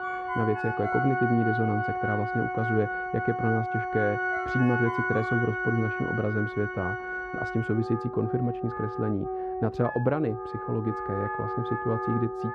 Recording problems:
muffled; very; fading above 3.5 kHz
background music; loud; throughout; 2 dB below the speech
phone ringing; noticeable; until 5.5 s; peak 7 dB below the speech

